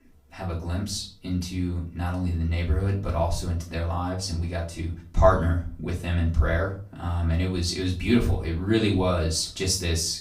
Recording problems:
off-mic speech; far
room echo; slight; dies away in 0.3 s

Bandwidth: 15.5 kHz